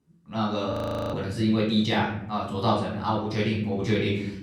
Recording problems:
off-mic speech; far
room echo; noticeable; dies away in 0.8 s
audio freezing; at 0.5 s

